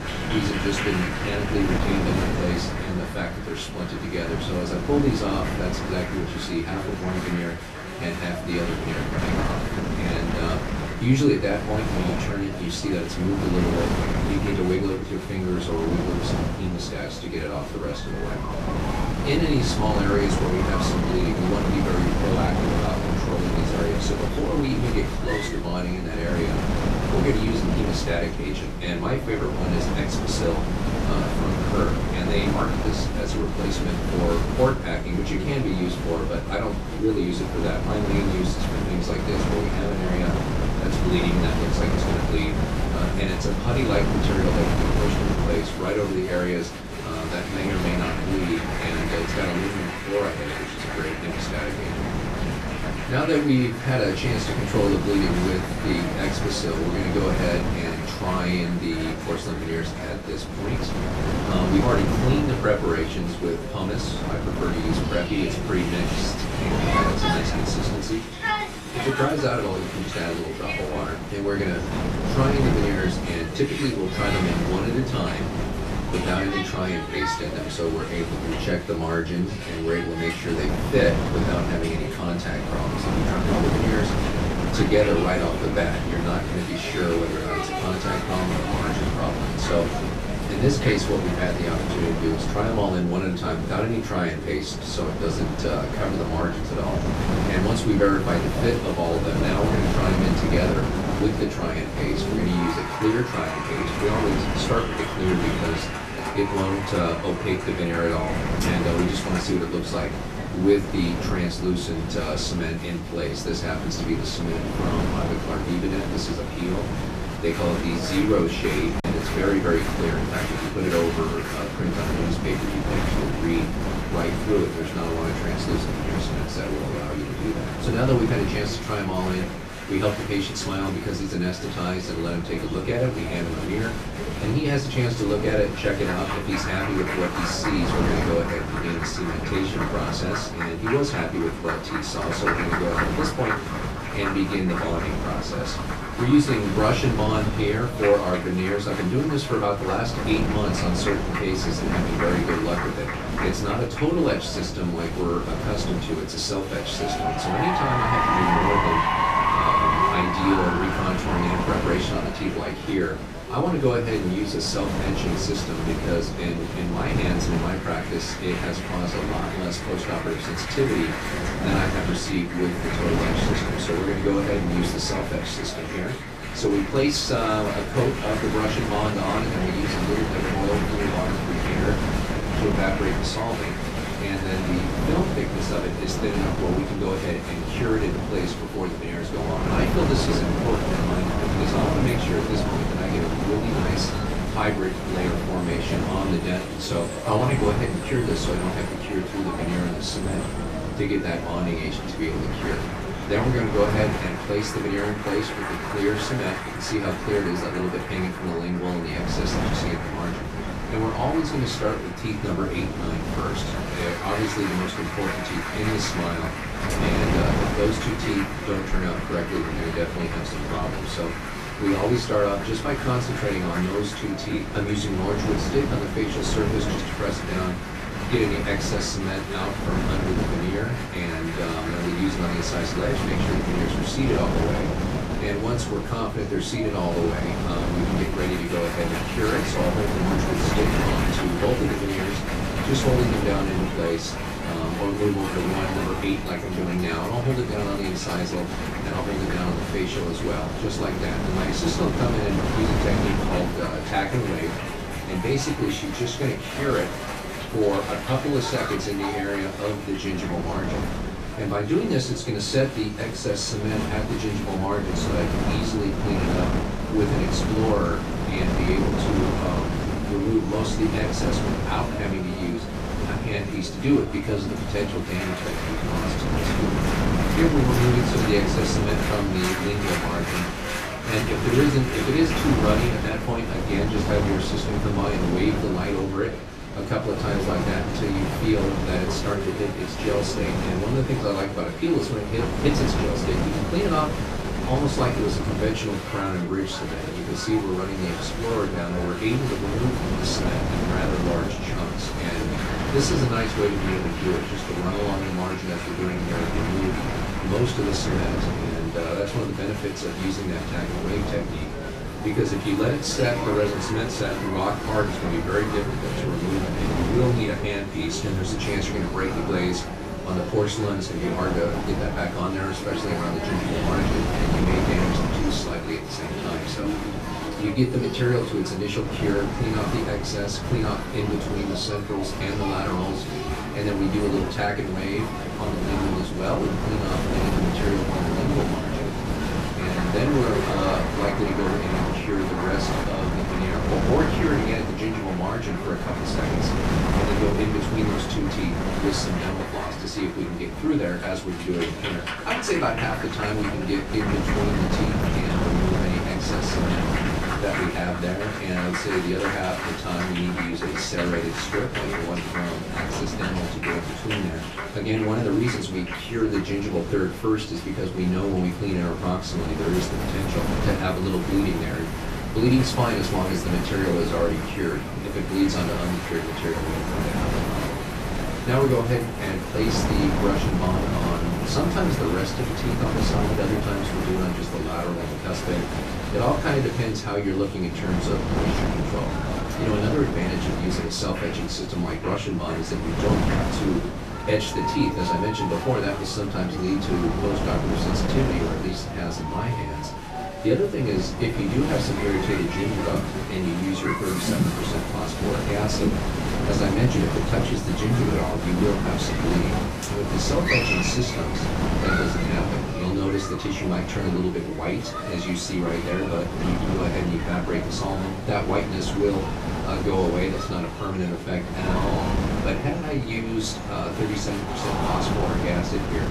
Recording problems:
off-mic speech; far
room echo; slight; dies away in 0.3 s
wind noise on the microphone; heavy; 4 dB below the speech
crowd noise; loud; throughout; 7 dB below the speech
background chatter; noticeable; throughout; 2 voices, 15 dB below the speech
choppy; occasionally; at 1:59; 1% of the speech affected

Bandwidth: 14.5 kHz